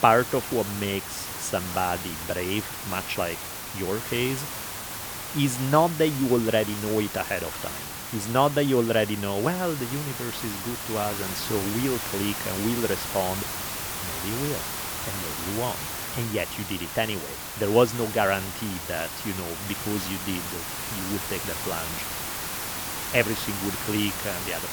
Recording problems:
hiss; loud; throughout; 4 dB below the speech

